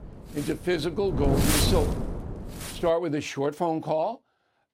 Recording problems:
wind noise on the microphone; heavy; until 3 s; 3 dB below the speech

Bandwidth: 16 kHz